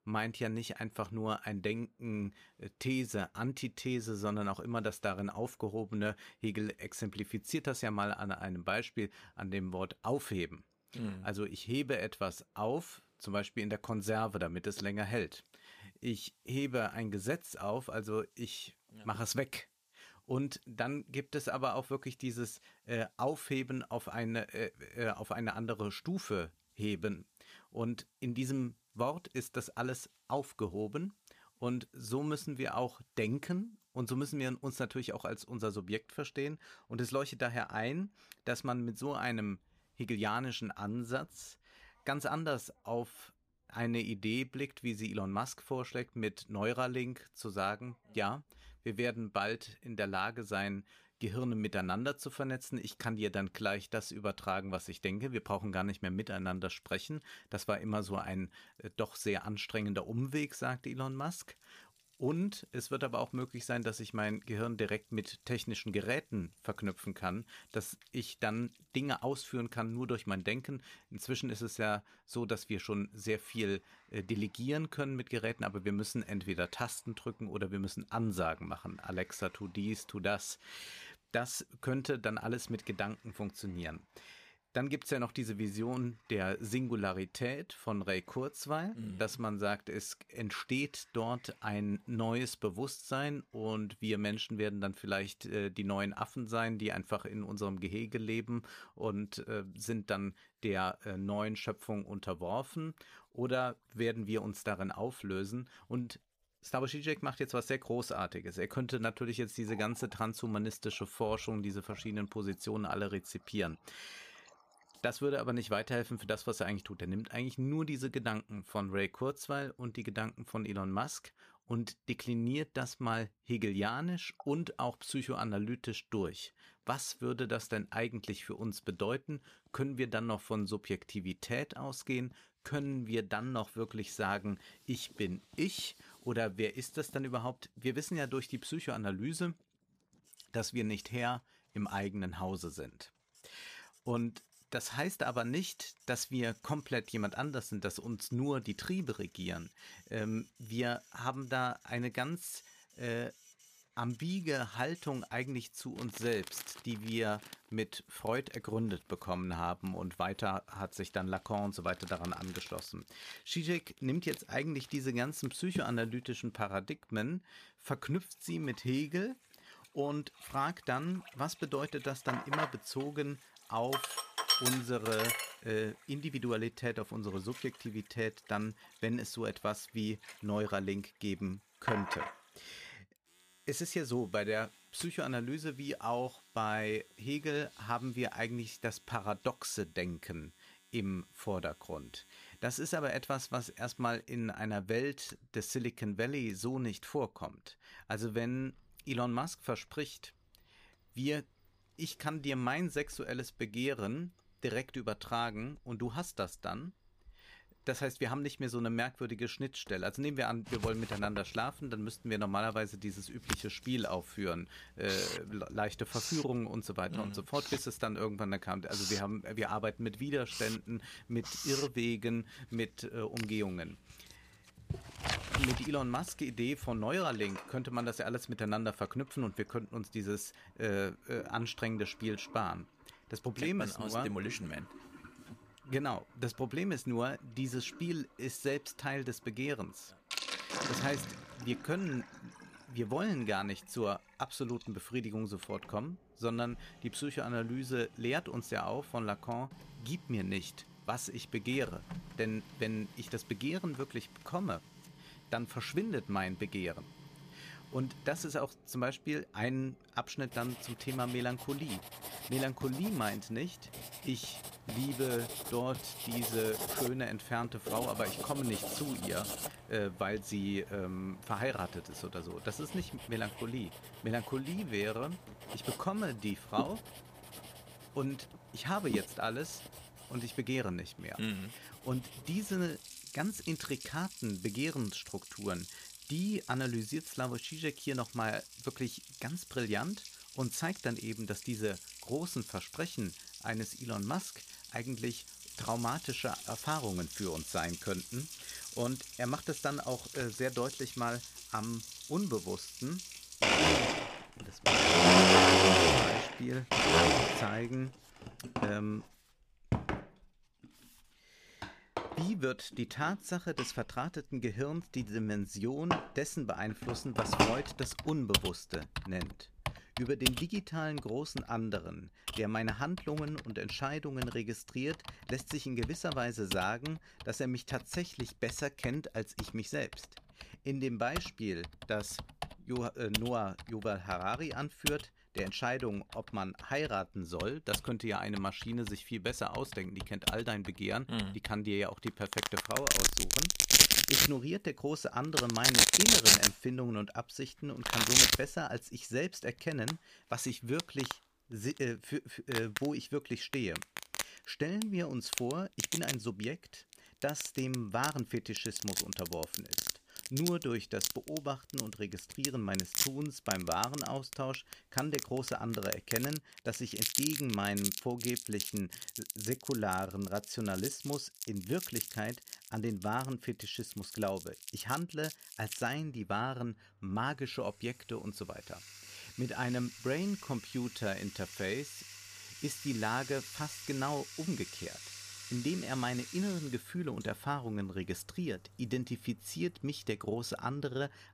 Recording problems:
household noises; very loud; throughout; 4 dB above the speech

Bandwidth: 15 kHz